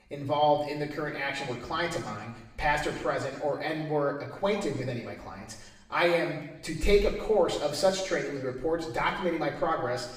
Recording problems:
off-mic speech; far
room echo; noticeable; dies away in 0.9 s

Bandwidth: 15.5 kHz